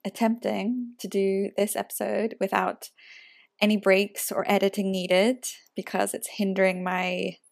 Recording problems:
none

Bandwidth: 14.5 kHz